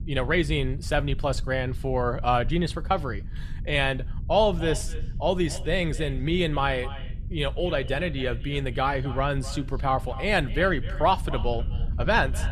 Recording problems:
echo of what is said; noticeable; from 4.5 s on; 250 ms later, 15 dB below the speech
low rumble; faint; throughout; 25 dB below the speech

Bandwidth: 13.5 kHz